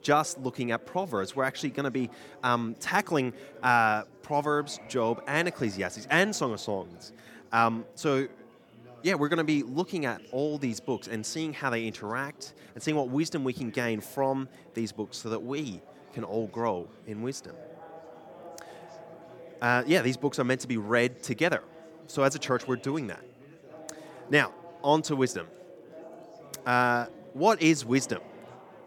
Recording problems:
chatter from many people; faint; throughout; 20 dB below the speech

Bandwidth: 17.5 kHz